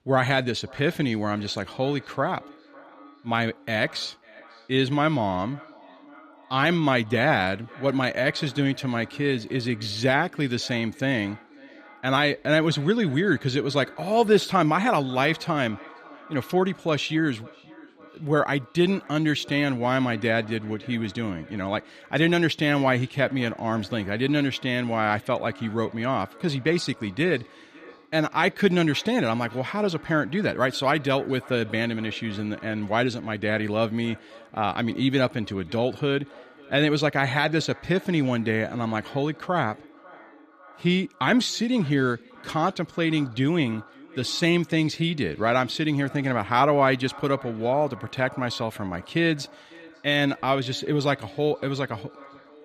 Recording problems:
echo of what is said; faint; throughout; 550 ms later, 20 dB below the speech

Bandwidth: 14.5 kHz